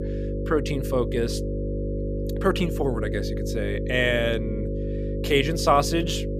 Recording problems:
electrical hum; loud; throughout; 50 Hz, 9 dB below the speech

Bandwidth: 14.5 kHz